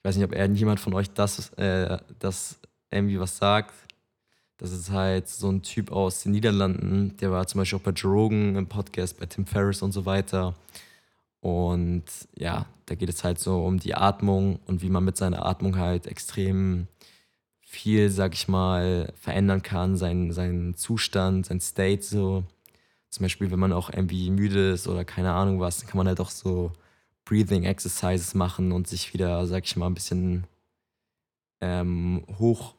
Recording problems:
none

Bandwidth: 17.5 kHz